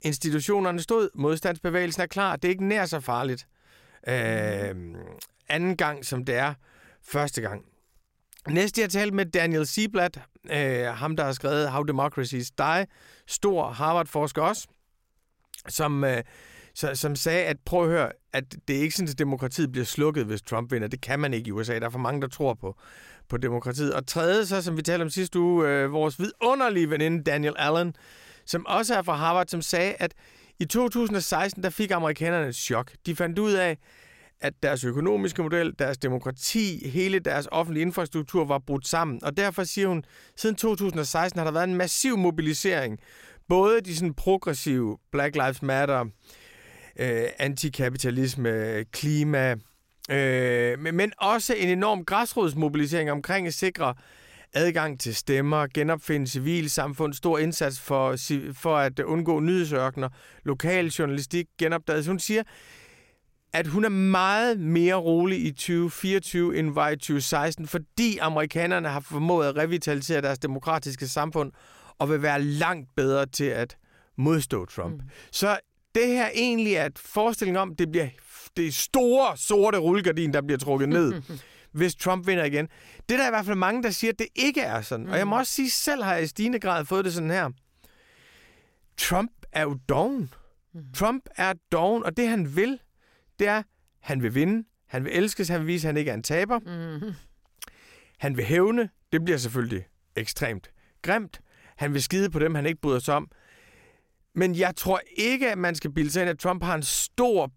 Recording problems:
none

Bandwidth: 16 kHz